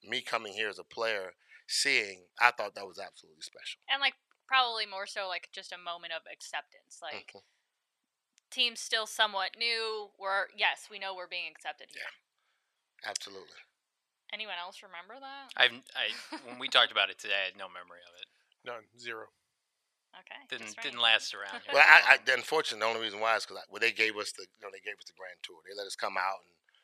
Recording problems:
thin; very; fading below 950 Hz

